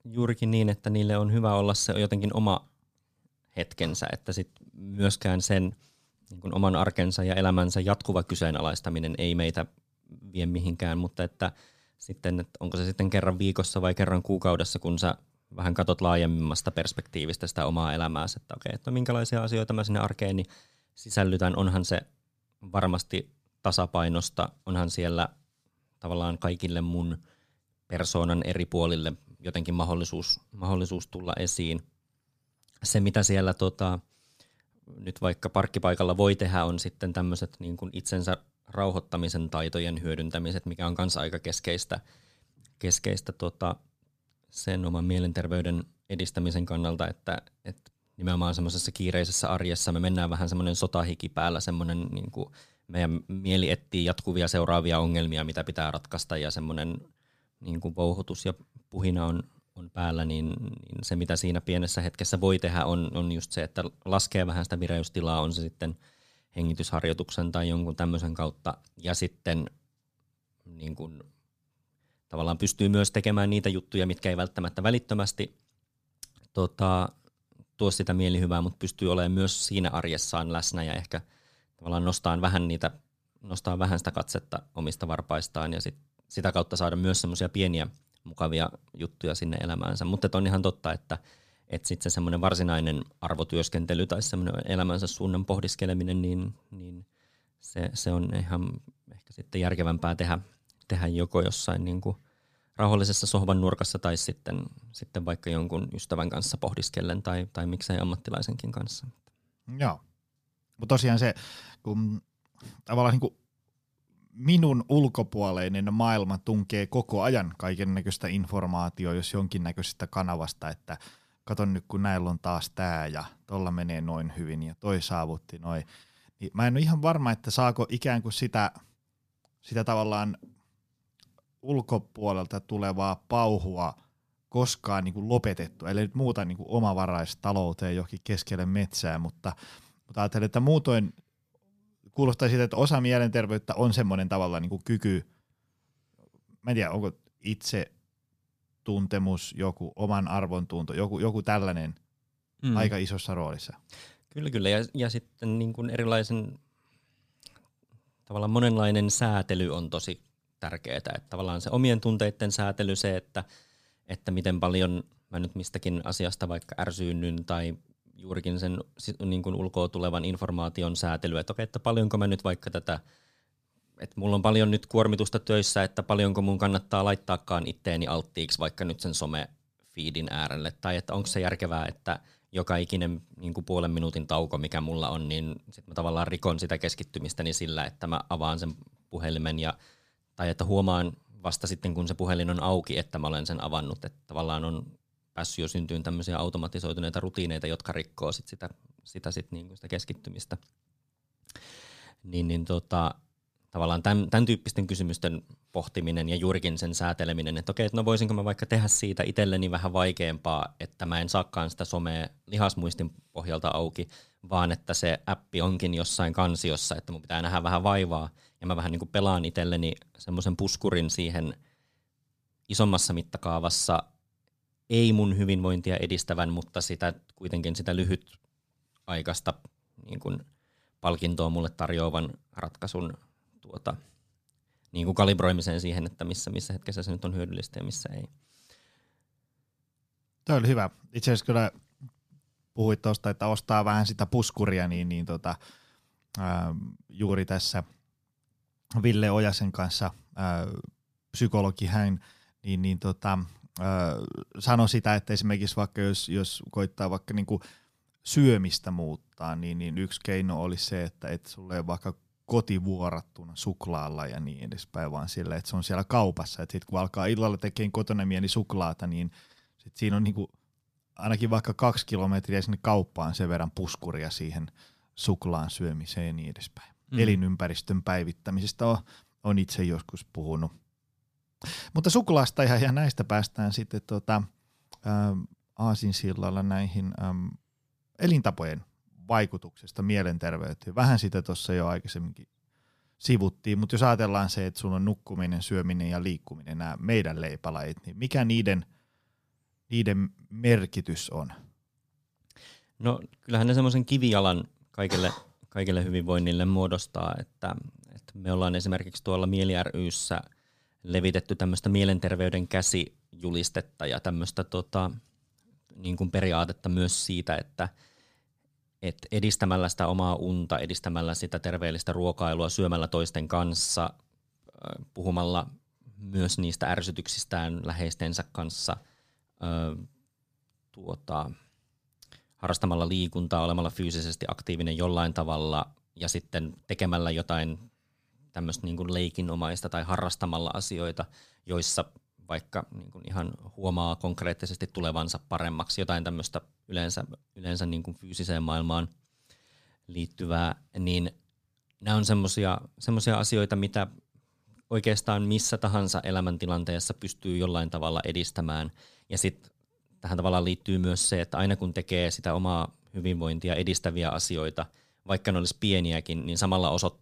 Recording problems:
none

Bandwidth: 15 kHz